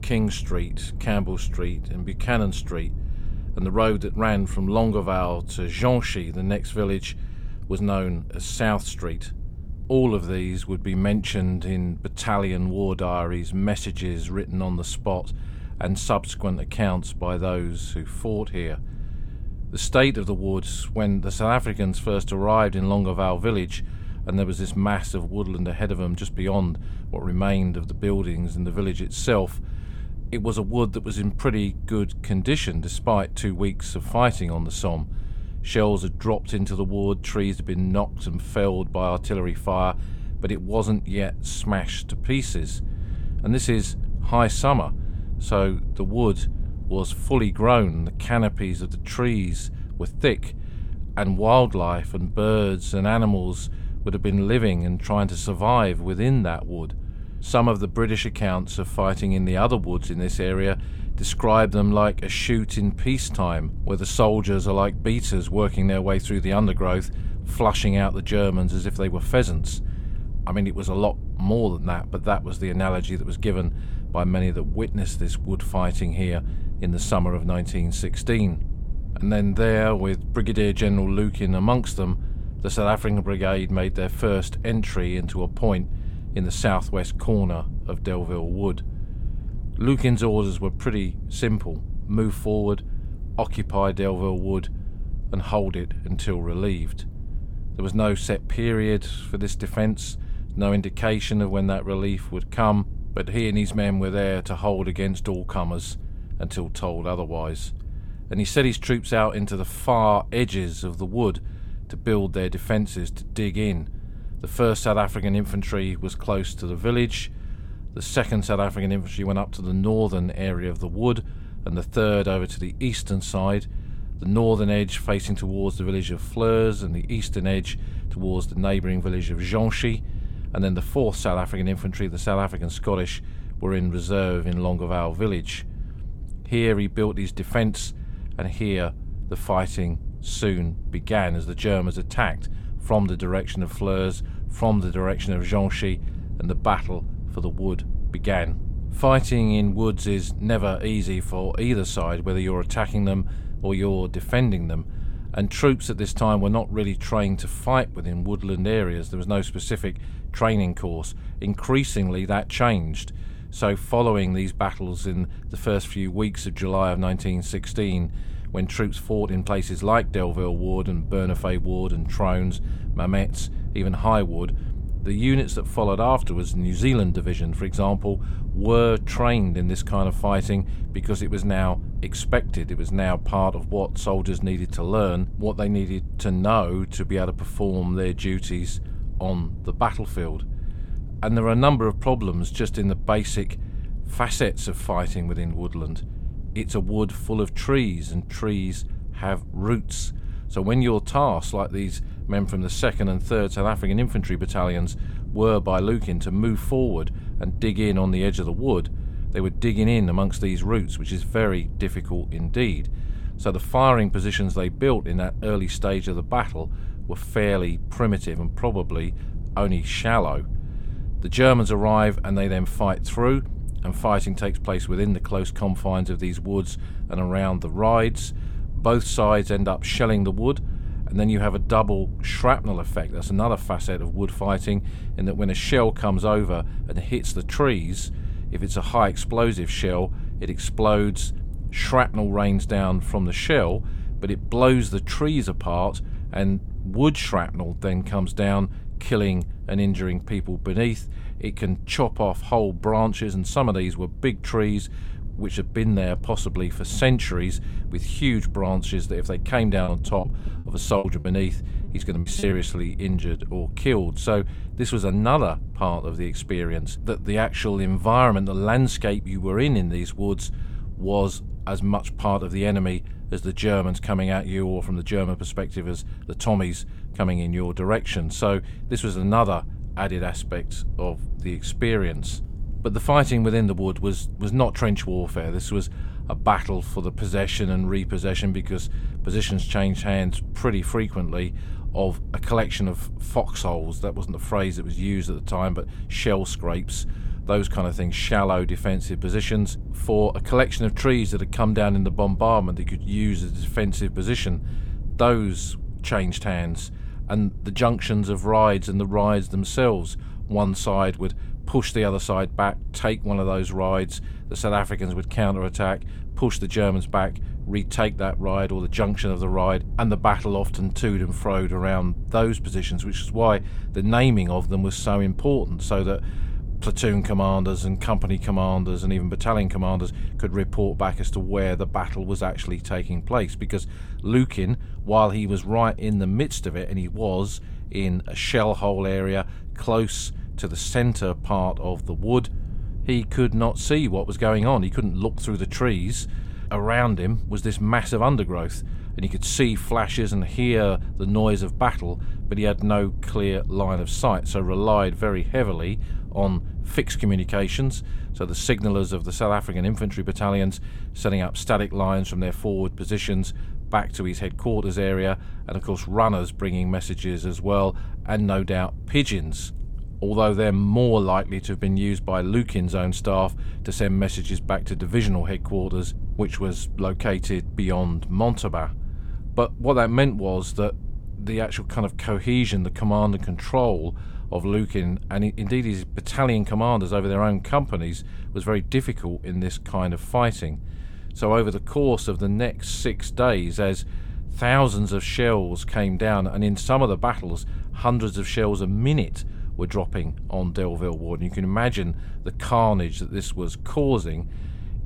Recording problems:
low rumble; faint; throughout; 25 dB below the speech
choppy; very; from 4:20 to 4:23; 16% of the speech affected

